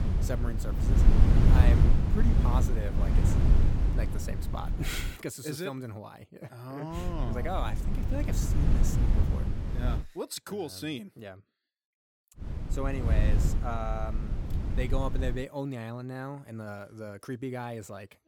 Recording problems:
wind noise on the microphone; heavy; until 5 s, from 7 to 10 s and from 12 to 15 s; 2 dB below the speech

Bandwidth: 17 kHz